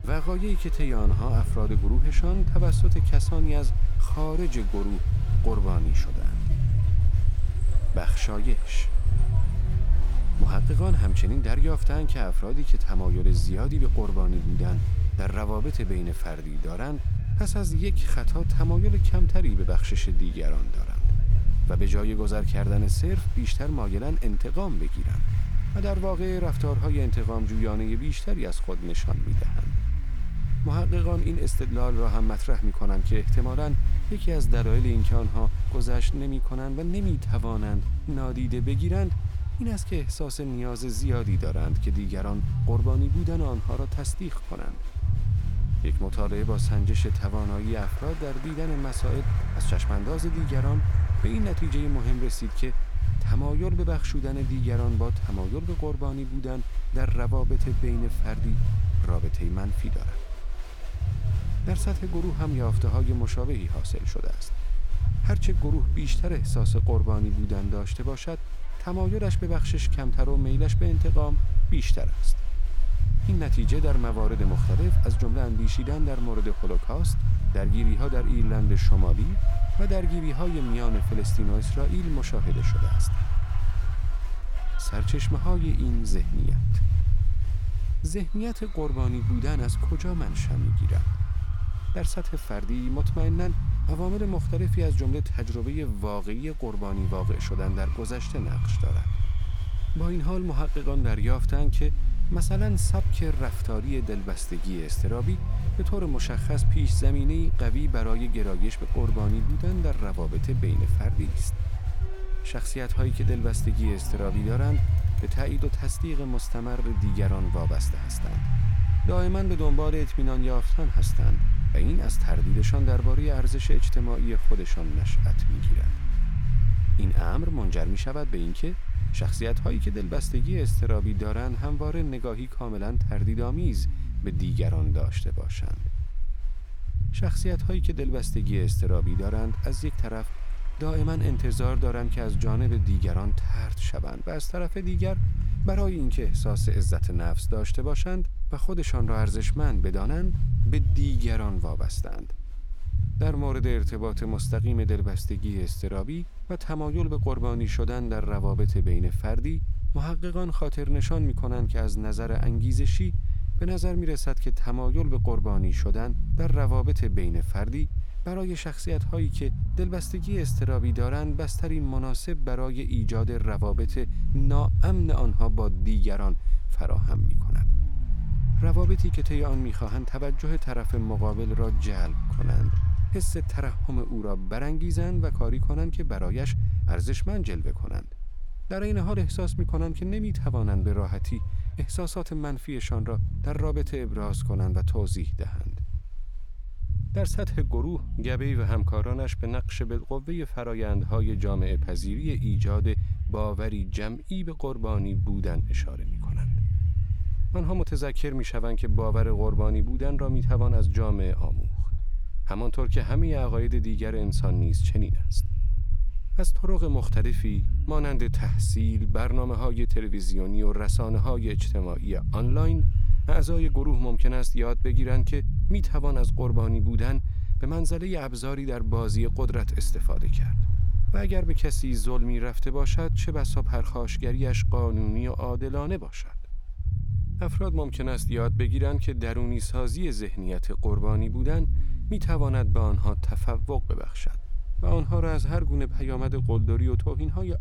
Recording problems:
low rumble; loud; throughout; 7 dB below the speech
crowd noise; noticeable; throughout; 15 dB below the speech

